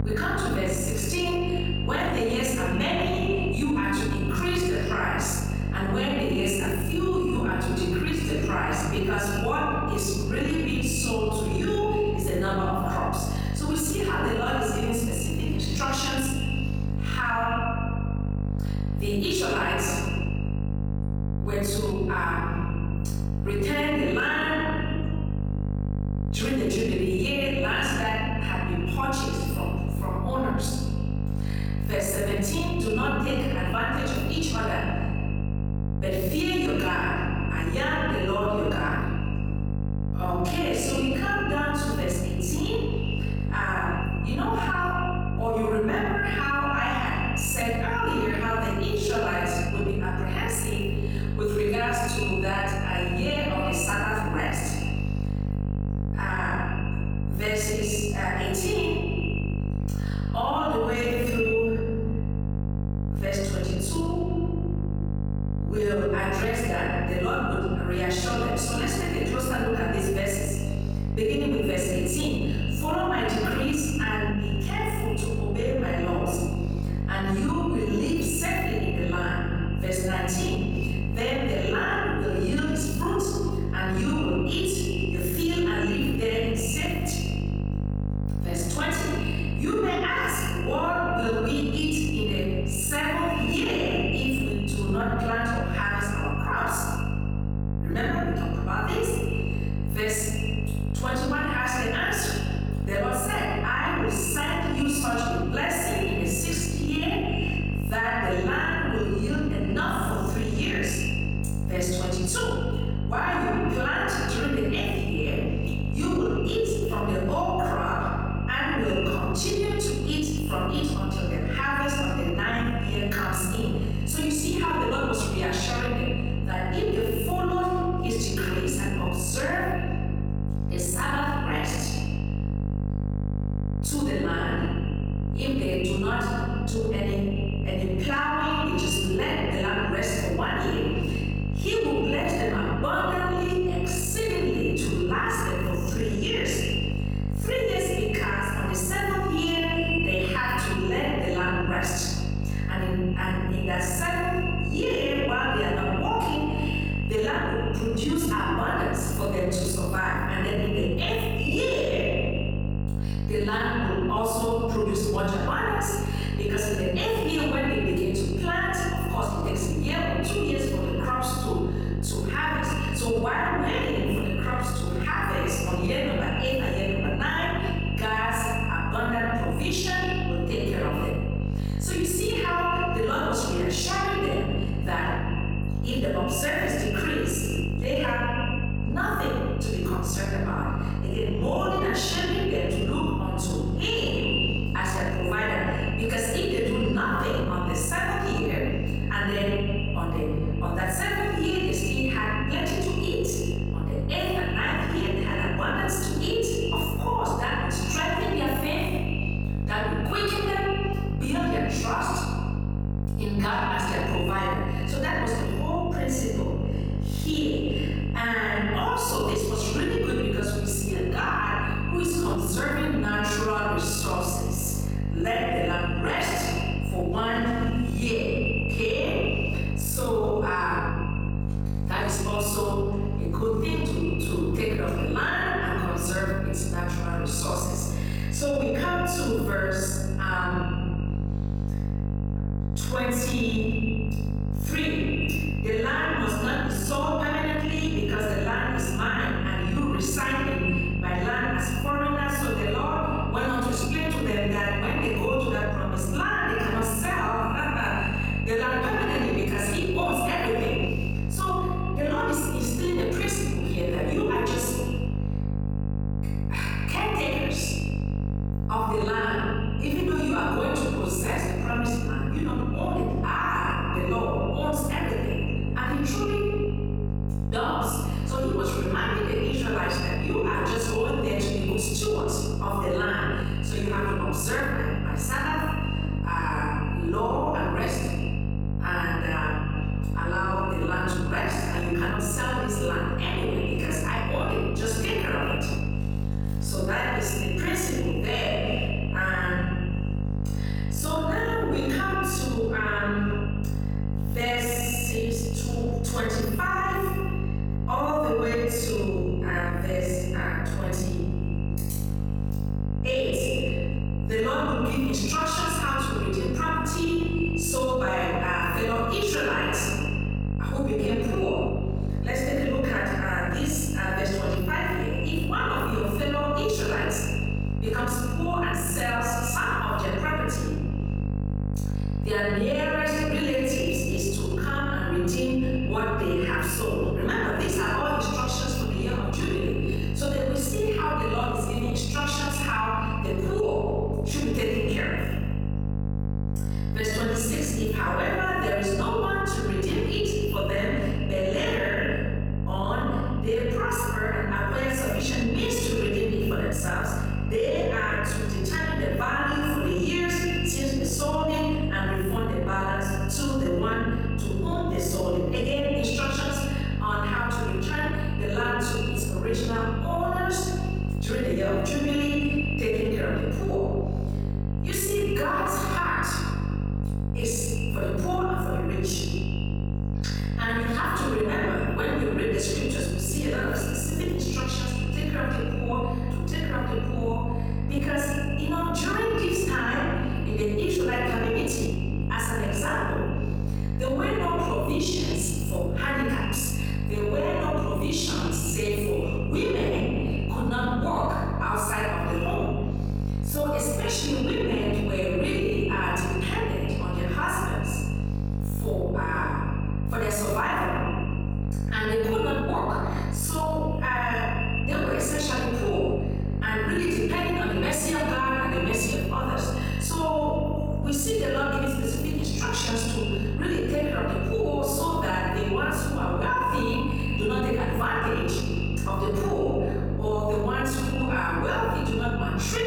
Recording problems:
echo of what is said; strong; throughout; 130 ms later, 10 dB below the speech
room echo; strong; dies away in 1.4 s
off-mic speech; far
squashed, flat; somewhat
electrical hum; noticeable; throughout; 50 Hz, 15 dB below the speech

